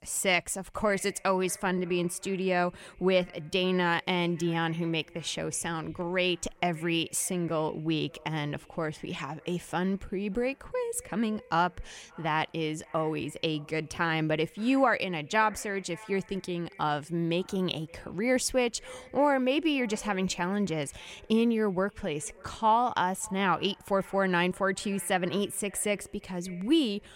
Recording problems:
echo of what is said; faint; throughout; 570 ms later, 25 dB below the speech

